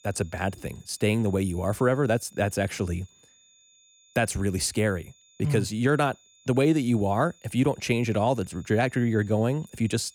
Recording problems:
high-pitched whine; faint; throughout; 7 kHz, 30 dB below the speech

